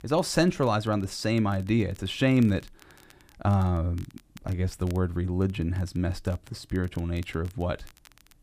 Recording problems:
crackle, like an old record; faint; 30 dB below the speech

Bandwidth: 15 kHz